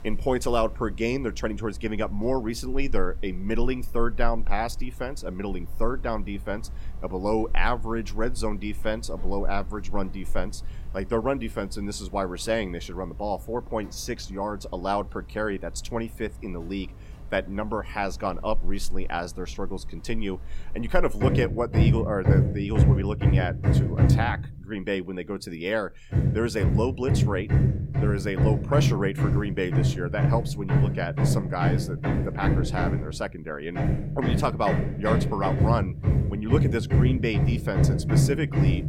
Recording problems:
machinery noise; very loud; throughout; 5 dB above the speech

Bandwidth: 16 kHz